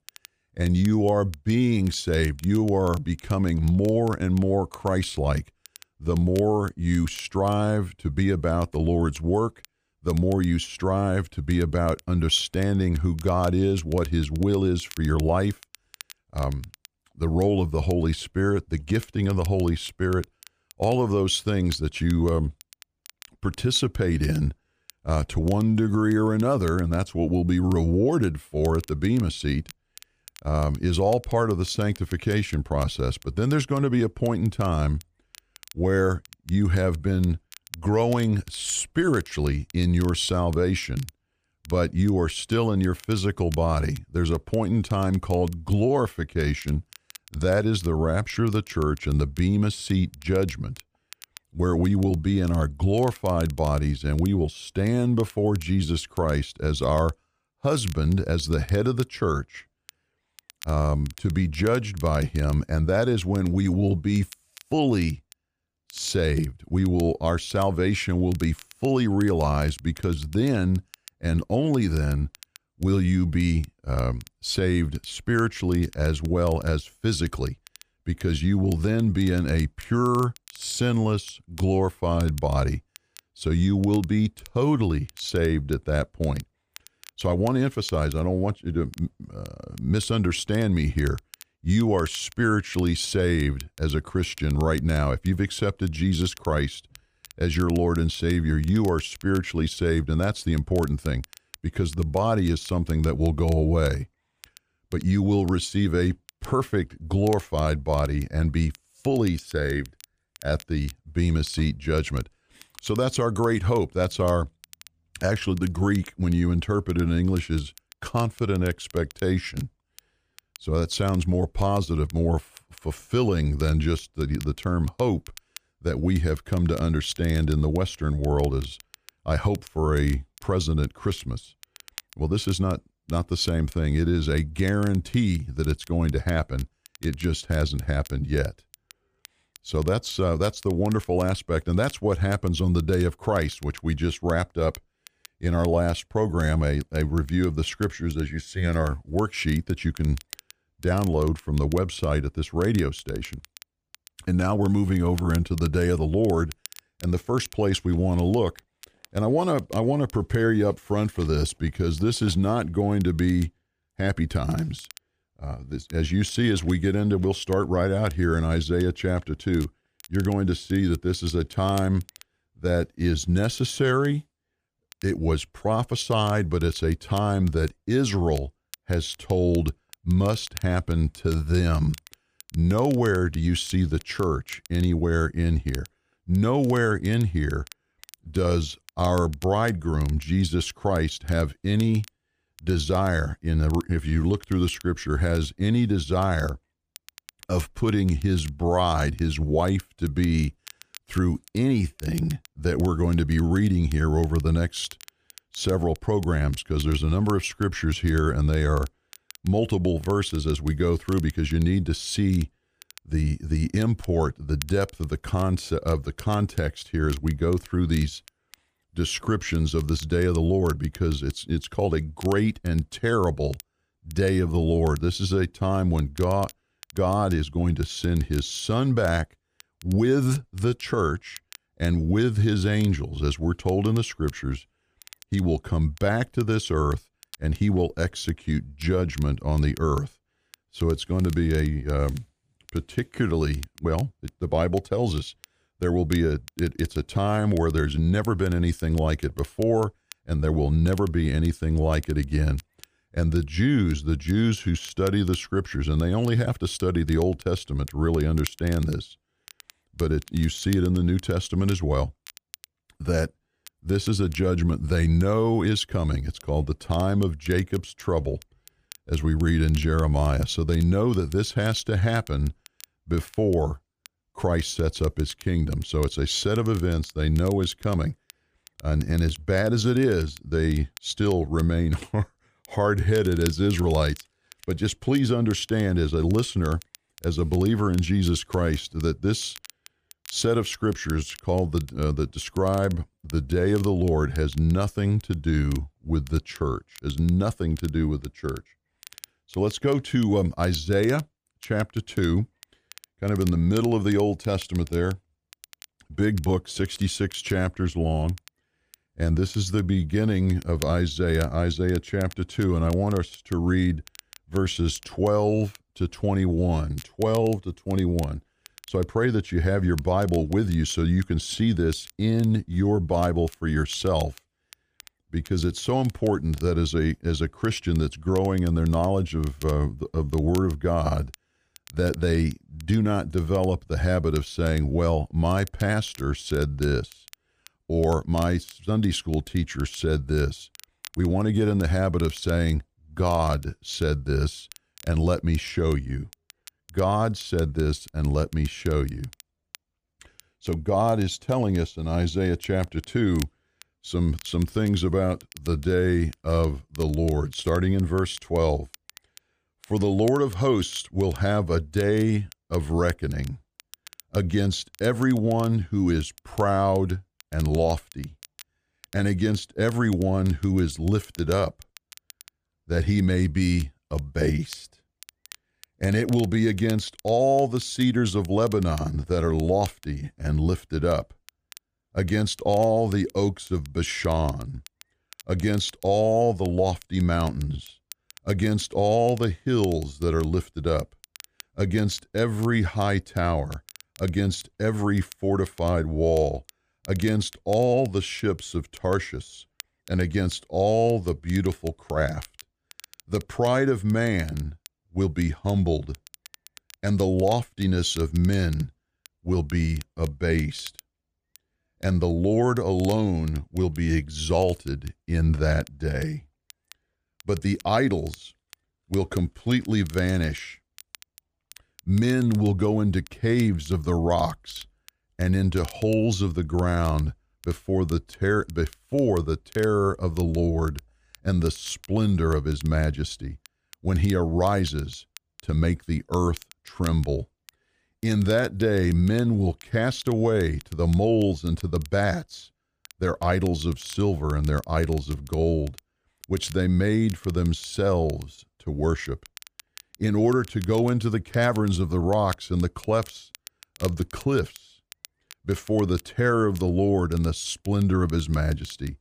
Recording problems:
crackle, like an old record; faint; 25 dB below the speech

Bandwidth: 15 kHz